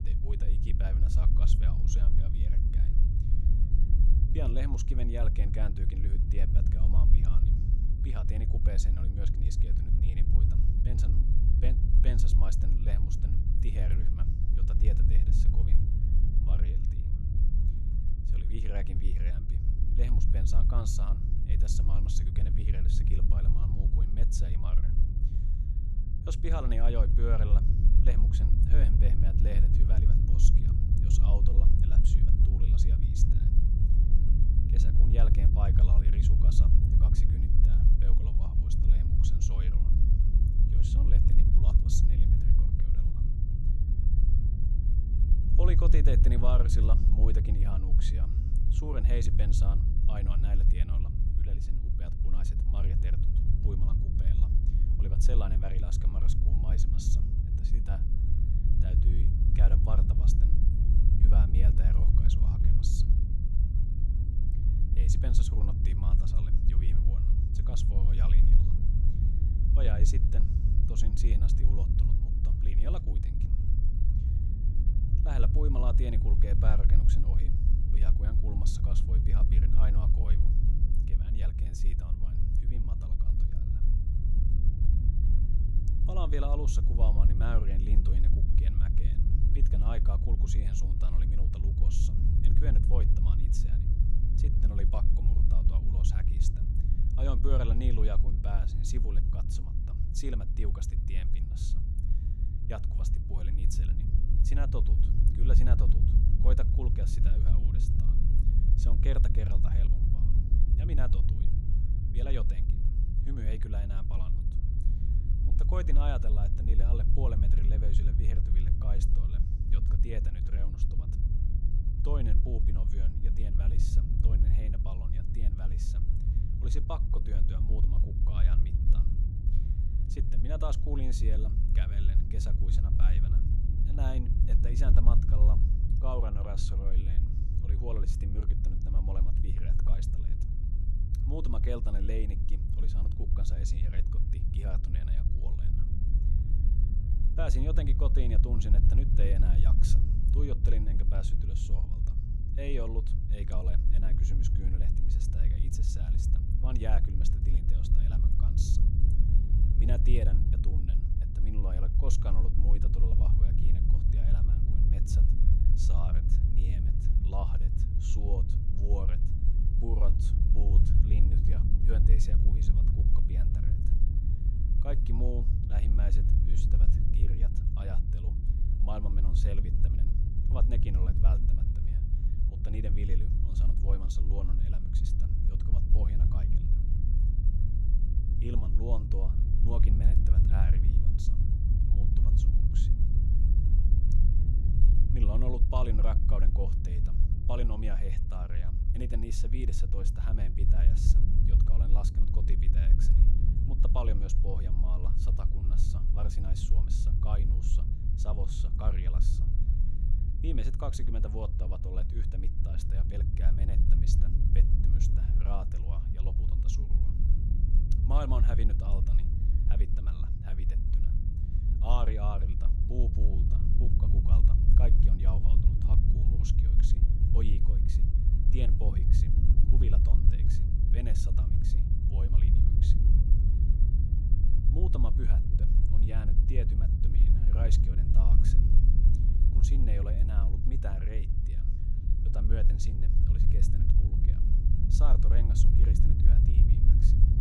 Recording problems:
low rumble; loud; throughout; 1 dB below the speech

